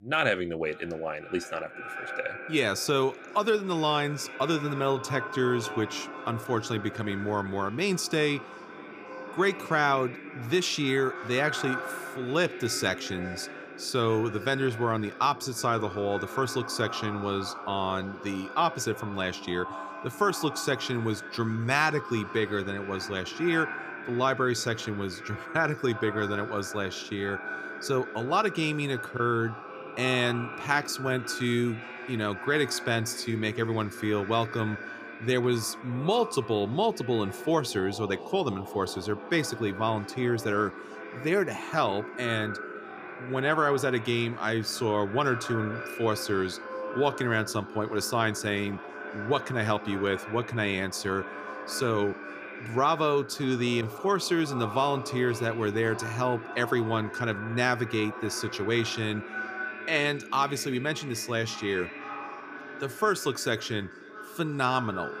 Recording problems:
echo of what is said; strong; throughout; 540 ms later, 10 dB below the speech

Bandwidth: 15 kHz